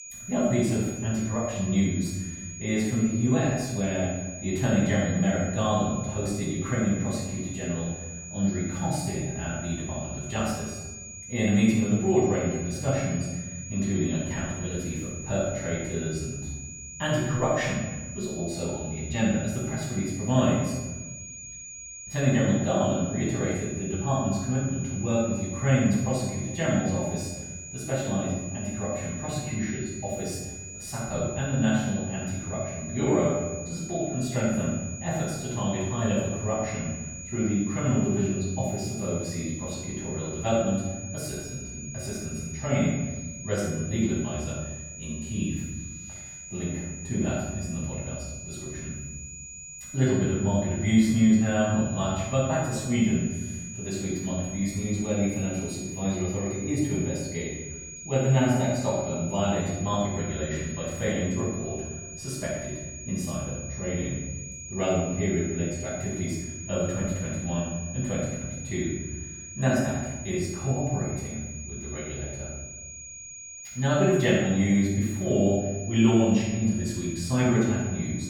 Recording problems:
room echo; strong; dies away in 1.2 s
off-mic speech; far
high-pitched whine; noticeable; throughout; 6.5 kHz, 10 dB below the speech

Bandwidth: 18 kHz